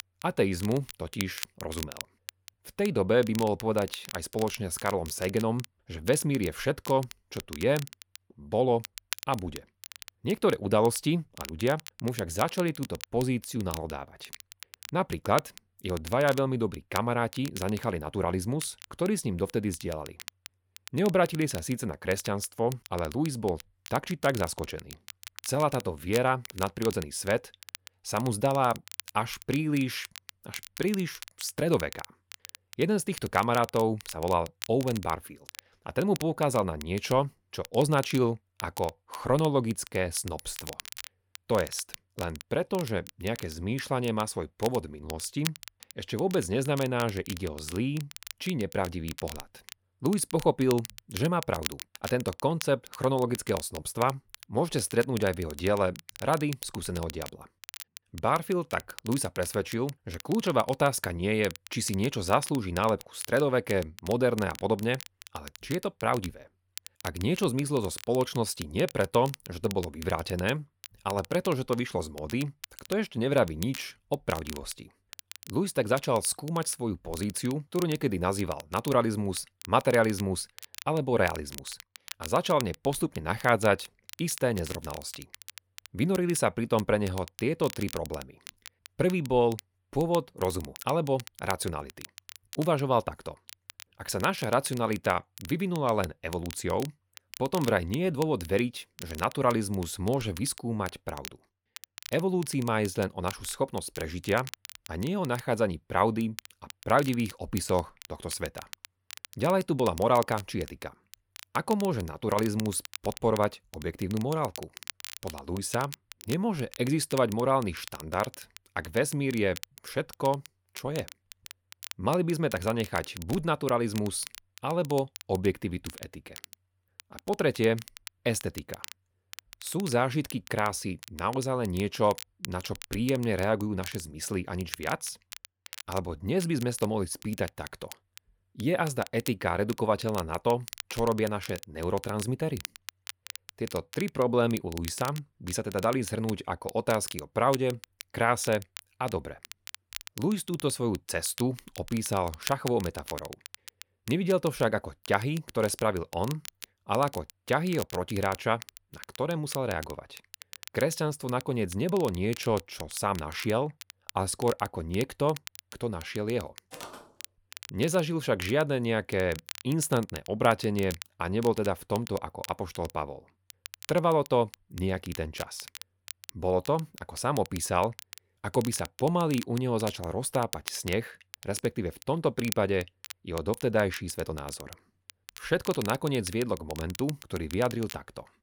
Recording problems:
crackle, like an old record; noticeable; 15 dB below the speech
footsteps; faint; at 2:47; peak 15 dB below the speech

